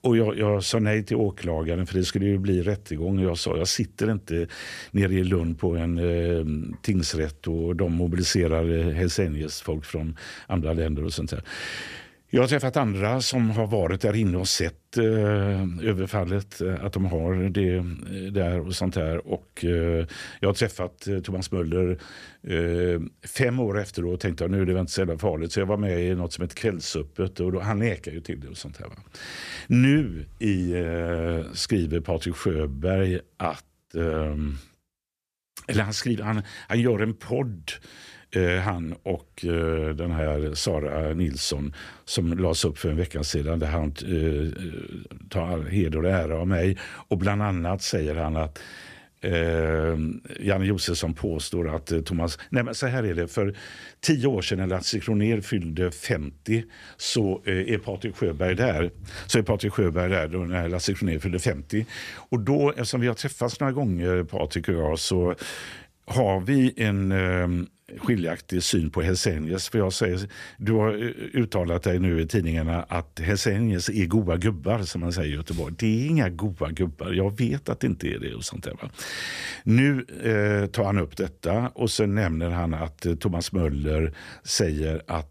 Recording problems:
none

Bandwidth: 14.5 kHz